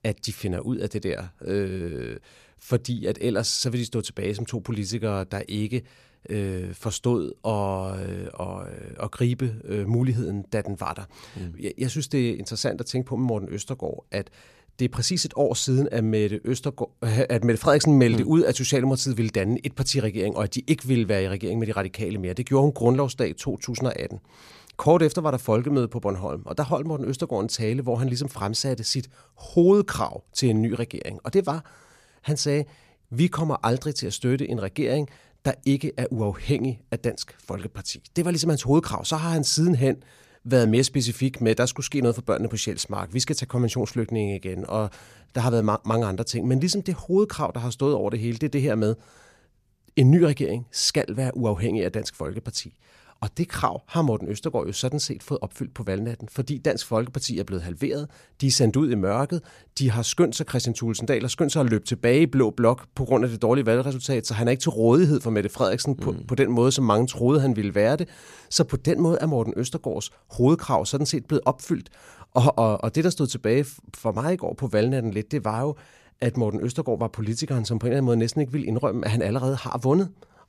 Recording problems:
none

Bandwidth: 14.5 kHz